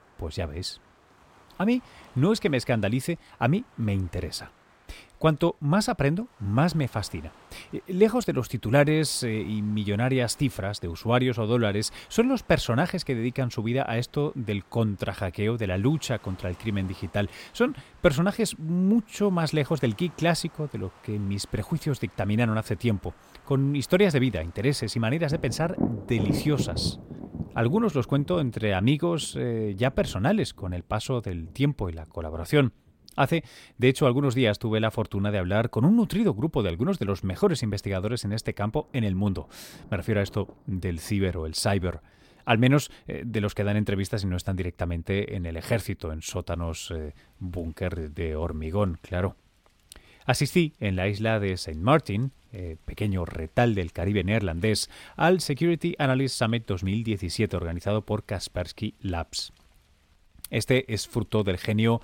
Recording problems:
rain or running water; noticeable; throughout; 15 dB below the speech

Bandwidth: 16.5 kHz